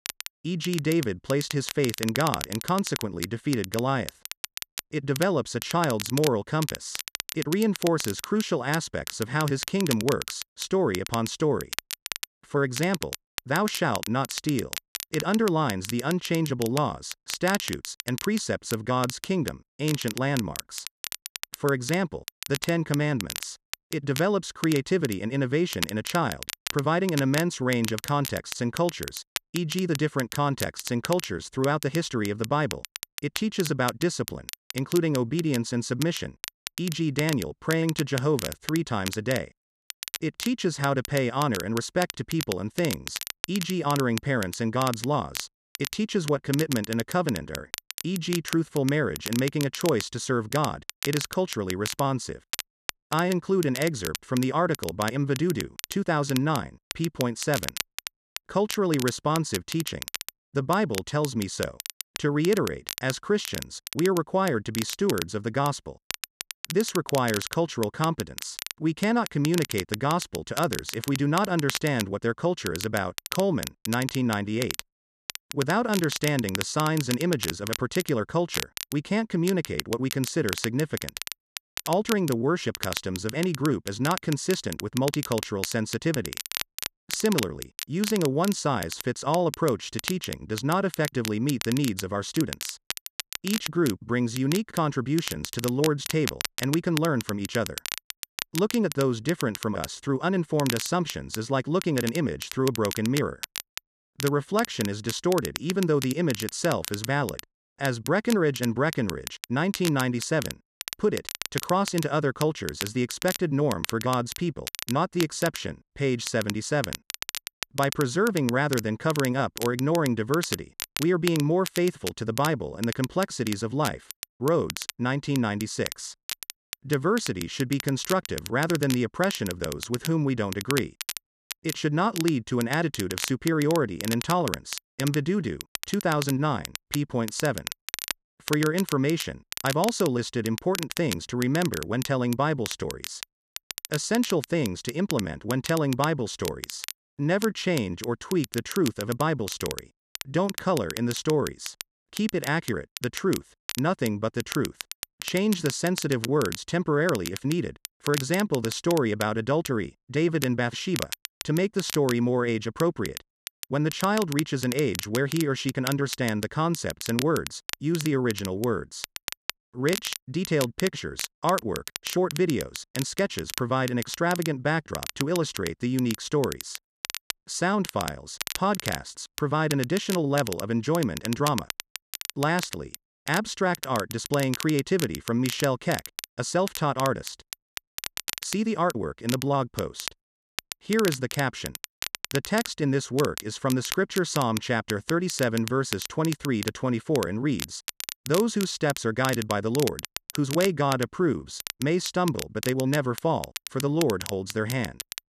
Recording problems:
crackle, like an old record; loud; 9 dB below the speech

